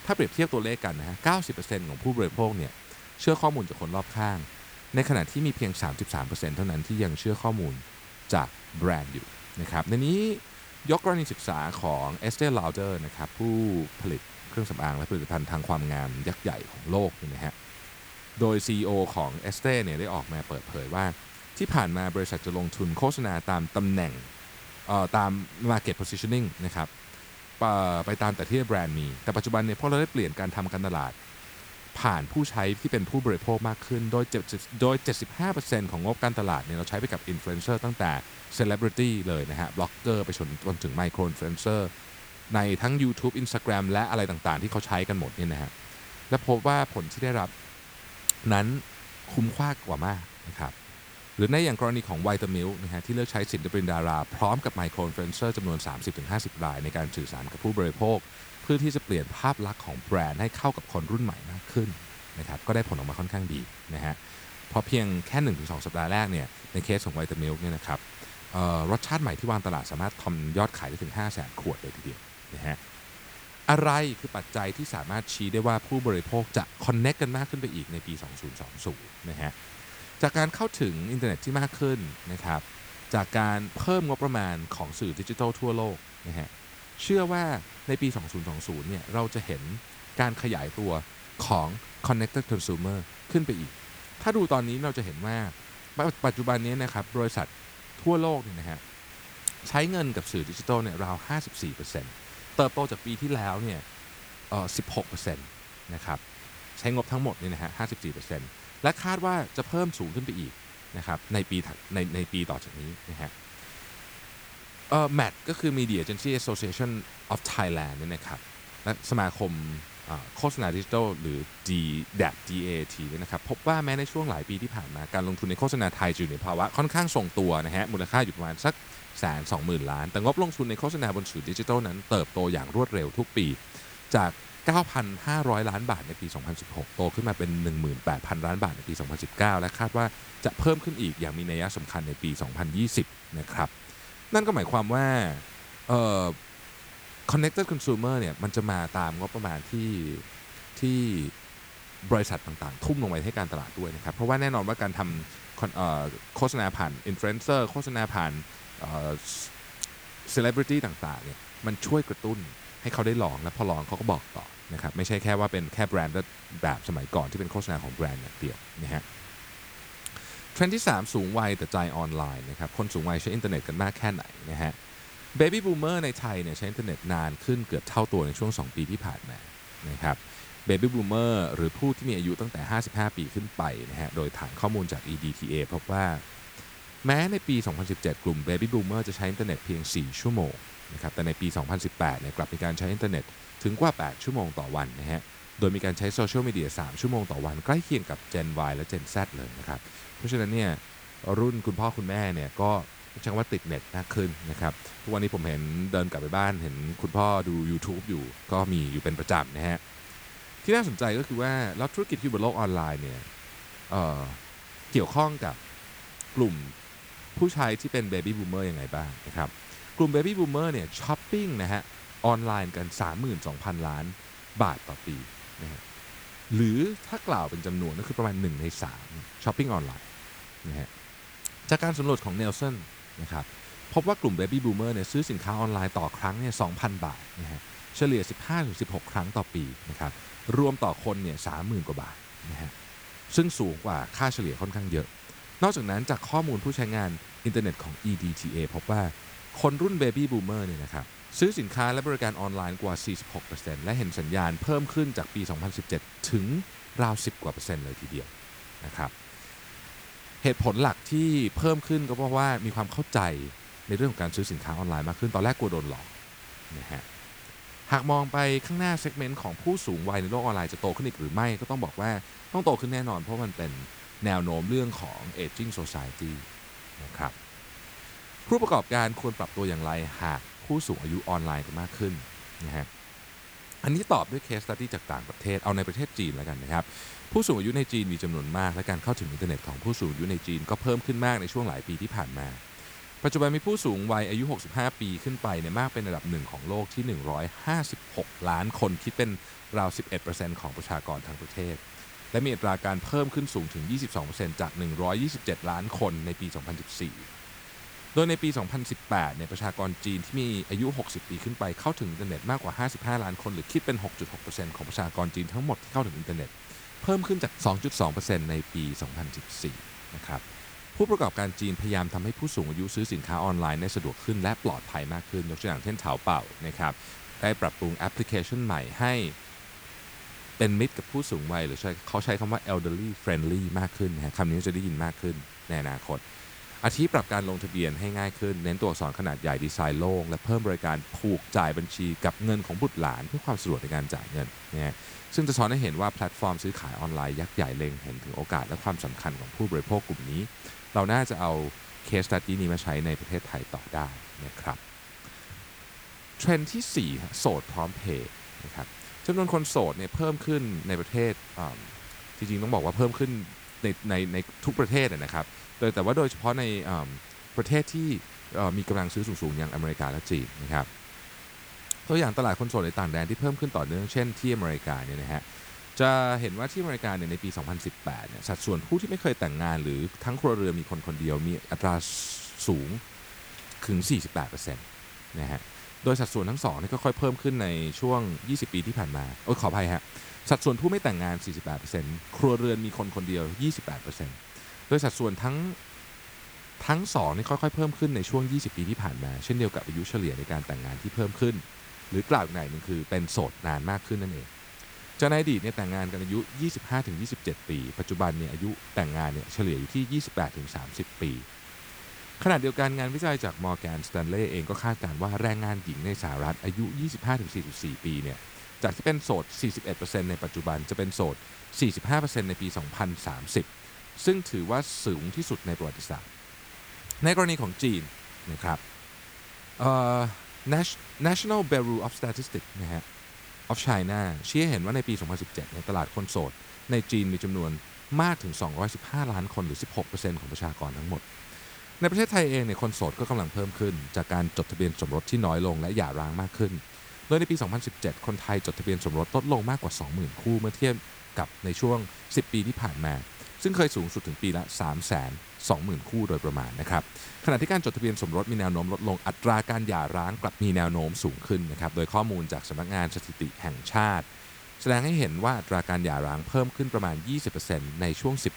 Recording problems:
hiss; noticeable; throughout; 15 dB below the speech

